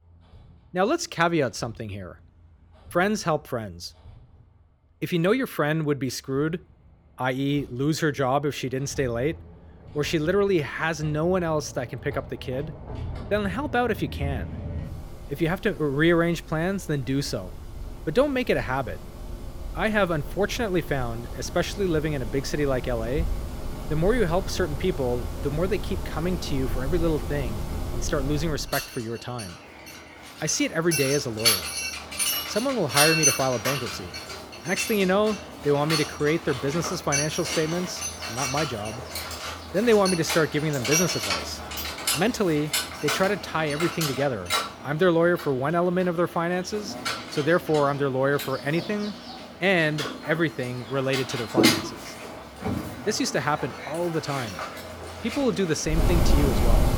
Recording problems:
machinery noise; loud; throughout; 4 dB below the speech

